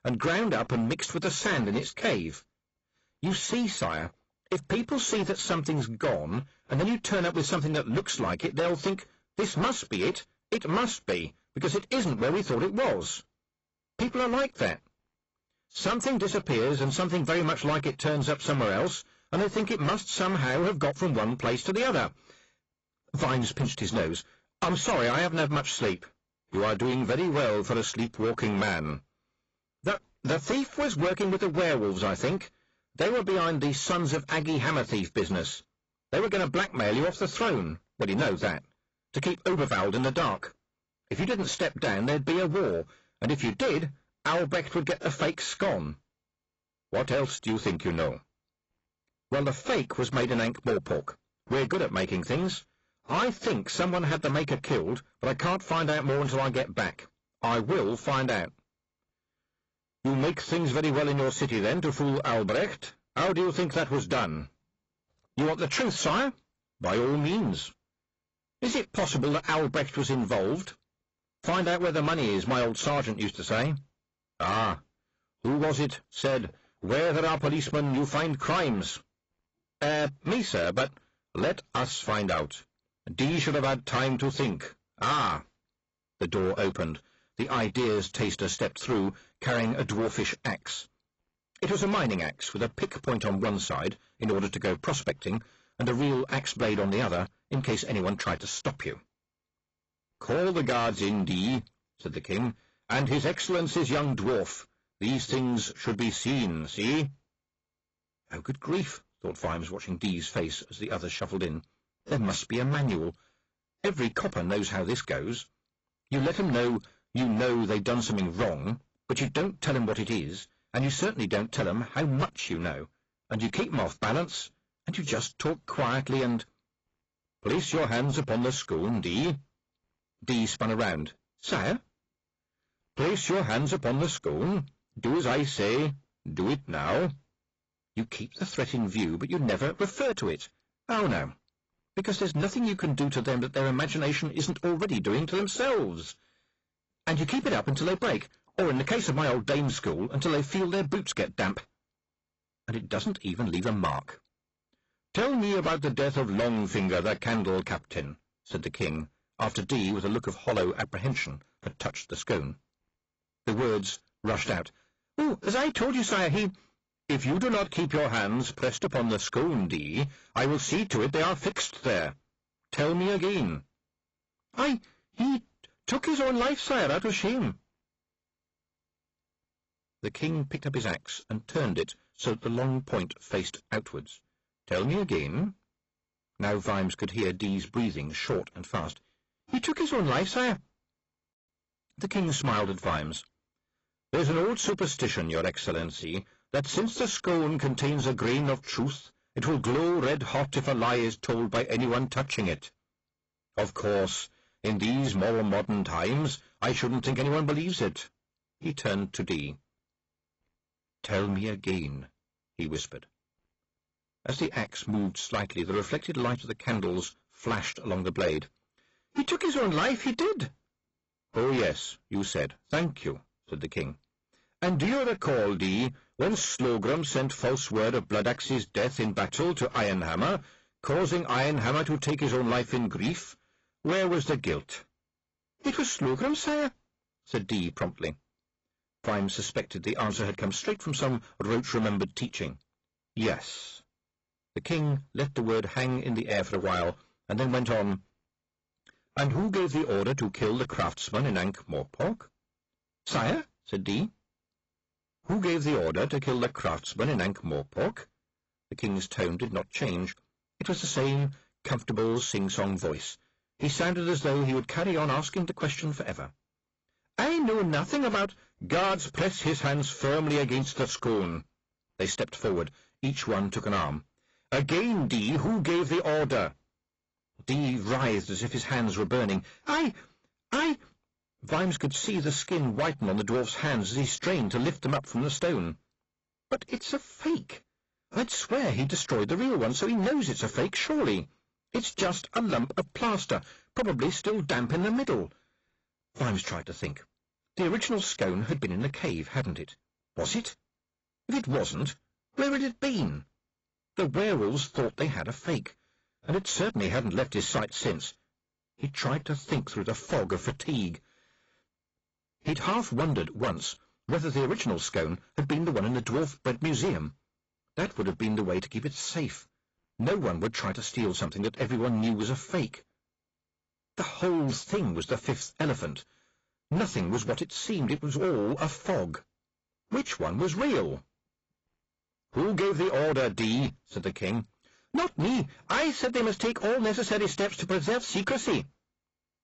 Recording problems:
distortion; heavy; 13% of the sound clipped
garbled, watery; badly; nothing above 7.5 kHz

